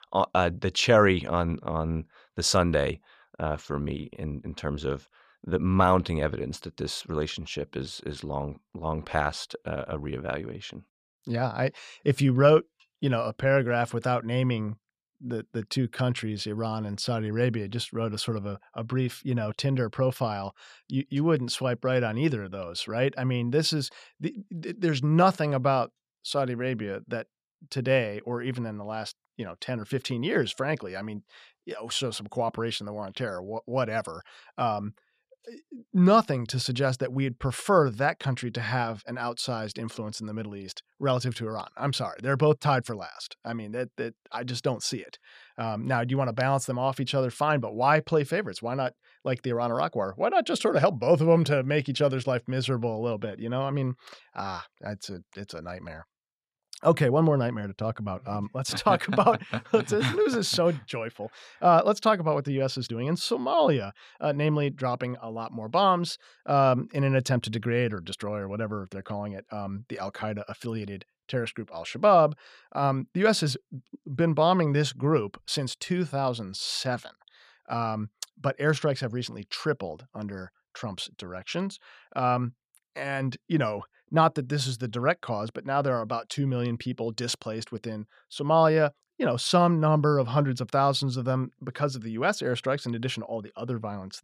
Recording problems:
none

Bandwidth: 14.5 kHz